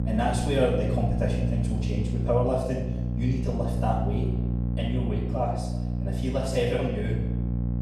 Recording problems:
off-mic speech; far
room echo; noticeable; dies away in 0.9 s
electrical hum; loud; throughout; 60 Hz, 9 dB below the speech

